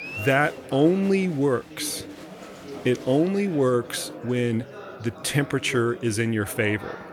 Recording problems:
chatter from many people; noticeable; throughout; 15 dB below the speech

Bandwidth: 18.5 kHz